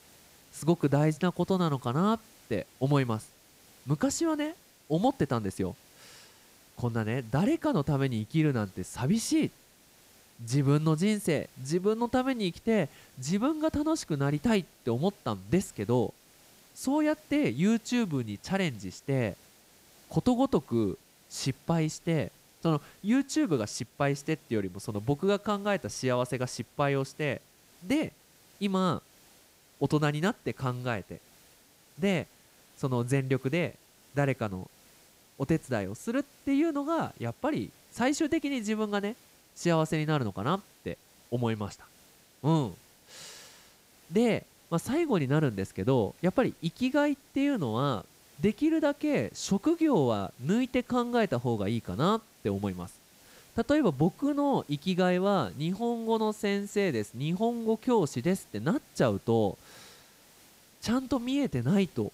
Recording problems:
hiss; faint; throughout; 25 dB below the speech

